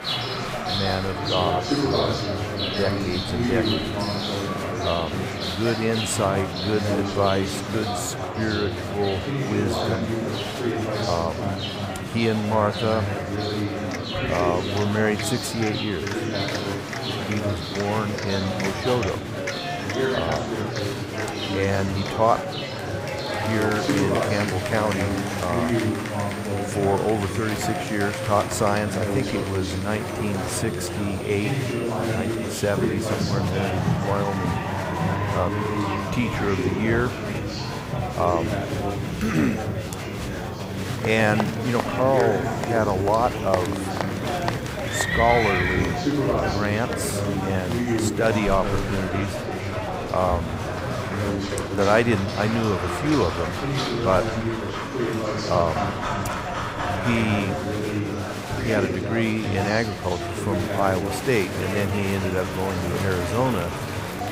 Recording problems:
animal sounds; loud; throughout; 7 dB below the speech
murmuring crowd; loud; throughout; 2 dB below the speech

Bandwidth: 15.5 kHz